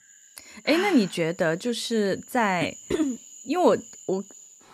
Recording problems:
animal sounds; noticeable; throughout; 20 dB below the speech

